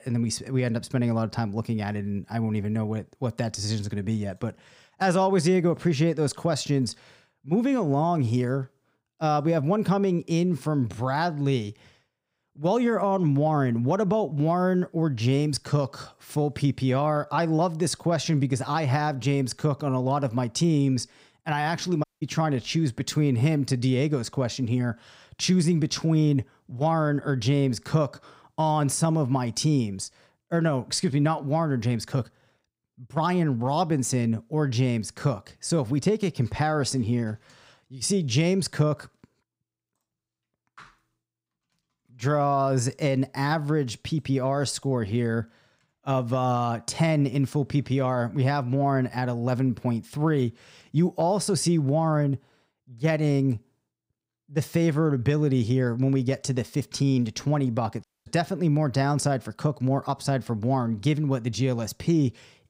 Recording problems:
audio cutting out; at 22 s and at 58 s

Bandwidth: 15.5 kHz